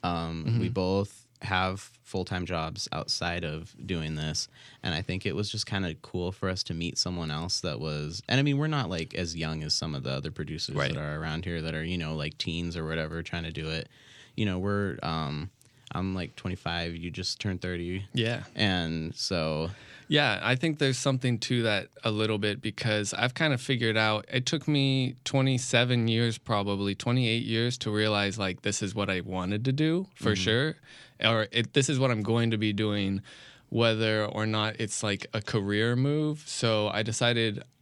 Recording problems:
none

